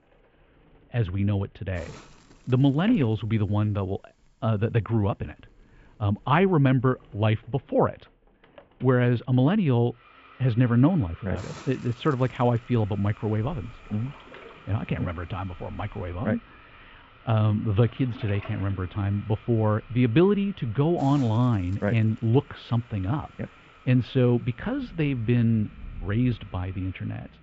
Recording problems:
muffled; very slightly; fading above 3 kHz
high frequencies cut off; slight; nothing above 8 kHz
household noises; faint; throughout; 25 dB below the speech
rain or running water; faint; from 13 s on; 25 dB below the speech
hiss; faint; until 7.5 s, from 10 to 16 s and from 18 s on; 25 dB below the speech

